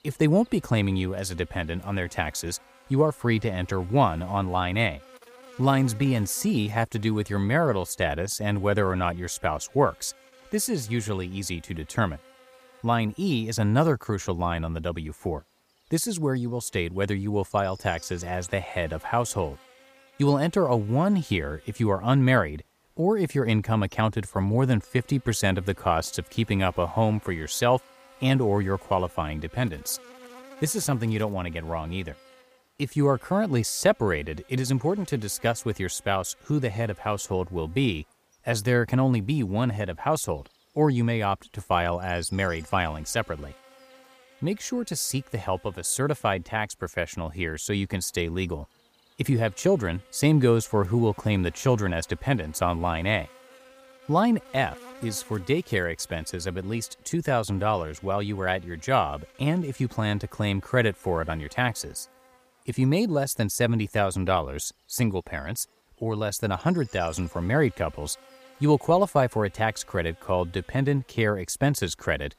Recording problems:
electrical hum; faint; throughout; 60 Hz, 25 dB below the speech

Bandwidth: 15 kHz